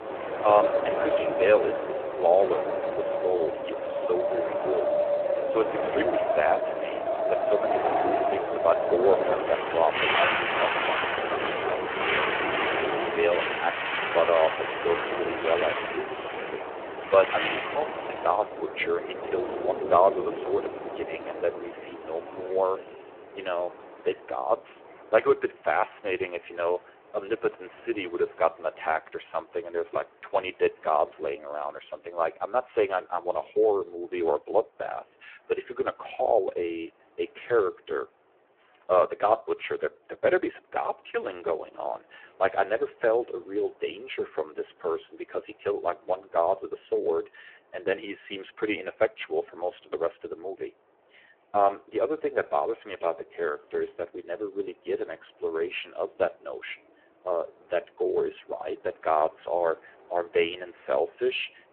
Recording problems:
phone-call audio; poor line
wind in the background; very loud; throughout; as loud as the speech

